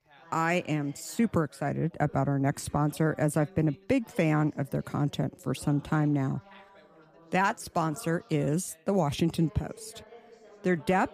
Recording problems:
background chatter; faint; throughout; 3 voices, 25 dB below the speech

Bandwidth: 15 kHz